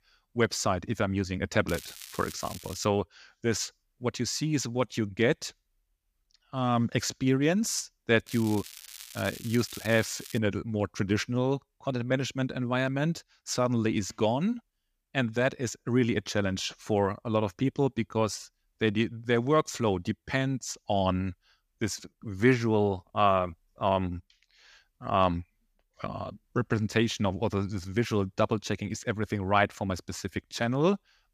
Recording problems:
crackling; noticeable; from 1.5 to 3 s and from 8.5 to 10 s; 15 dB below the speech

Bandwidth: 15 kHz